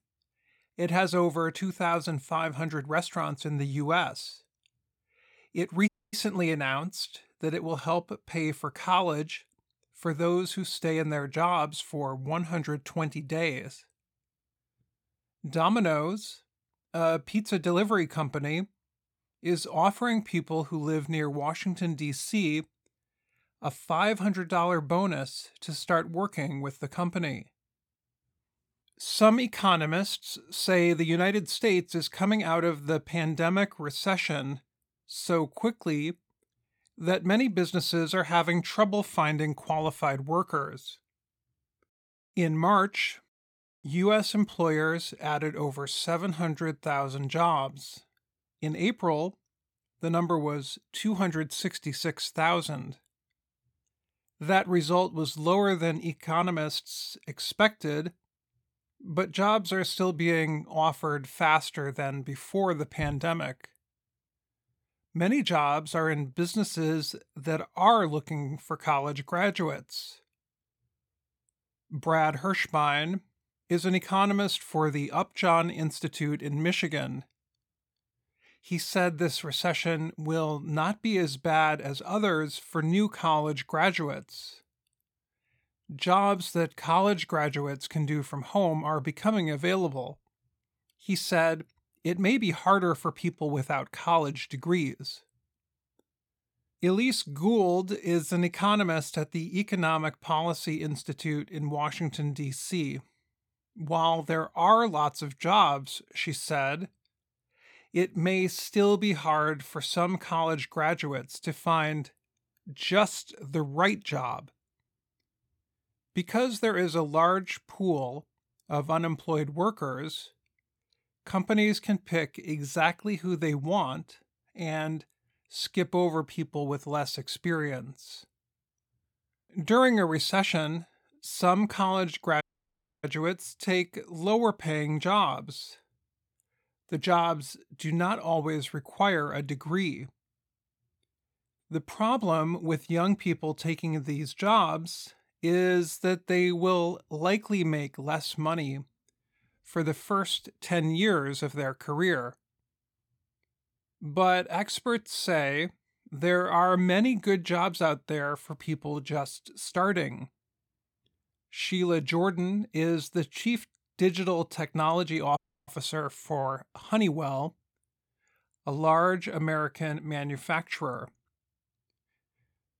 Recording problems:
audio cutting out; at 6 s, at 2:12 for 0.5 s and at 2:45

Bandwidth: 17 kHz